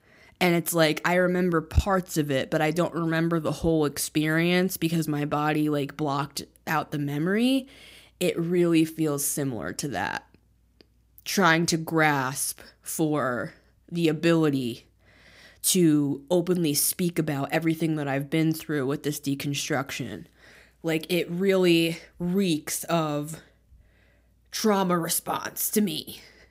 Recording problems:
none

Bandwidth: 15.5 kHz